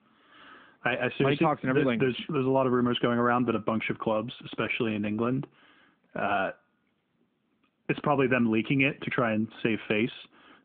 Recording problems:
phone-call audio

